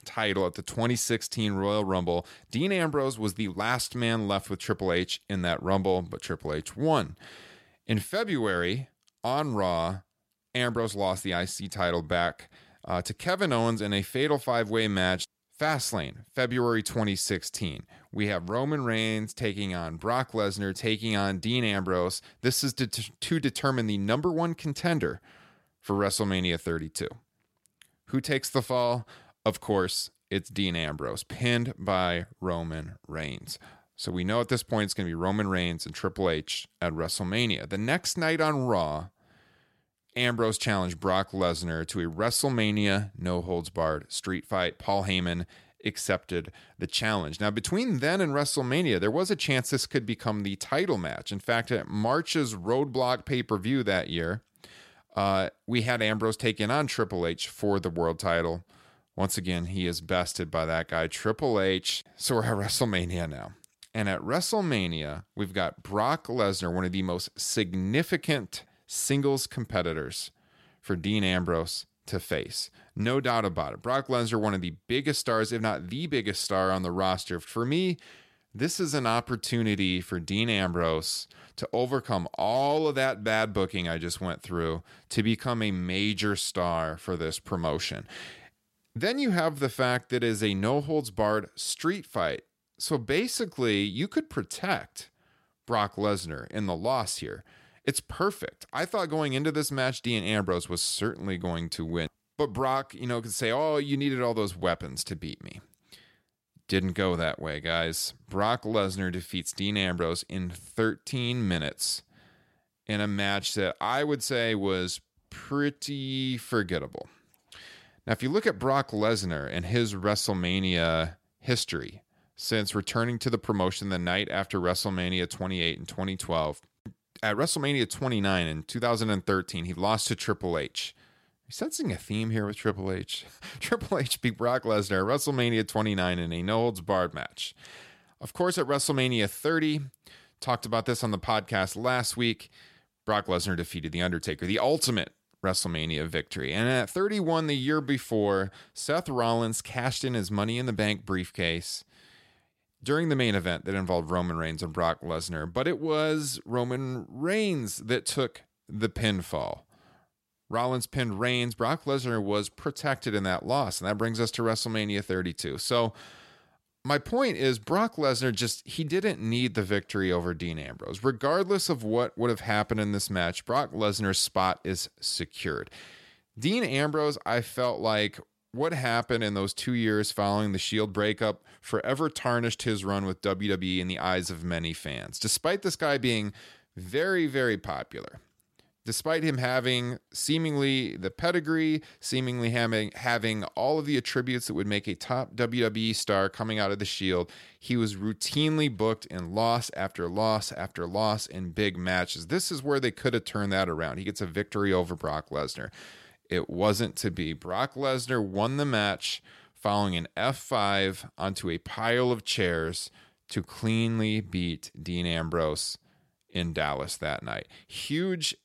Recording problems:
none

